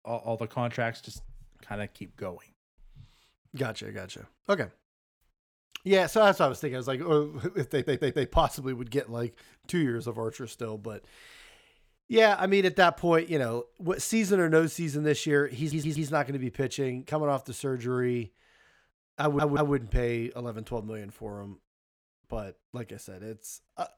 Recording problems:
audio stuttering; at 7.5 s, at 16 s and at 19 s

